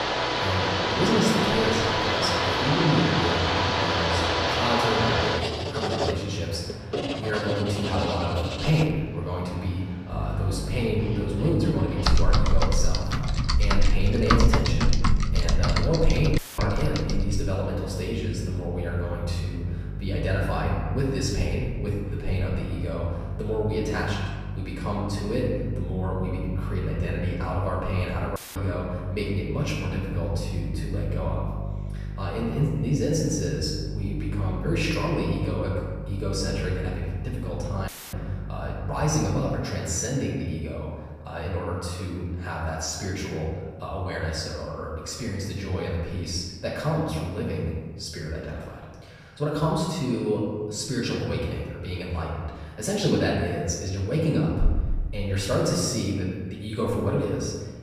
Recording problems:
off-mic speech; far
room echo; noticeable; dies away in 1.3 s
household noises; very loud; until 17 s; 2 dB above the speech
electrical hum; noticeable; from 10 to 40 s; 50 Hz, 15 dB below the speech
audio cutting out; filled with static; at 16 s, at 28 s and at 38 s

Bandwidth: 14.5 kHz